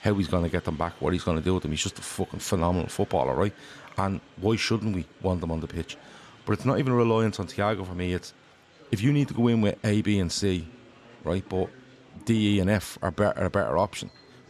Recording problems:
murmuring crowd; faint; throughout; 25 dB below the speech

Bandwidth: 13.5 kHz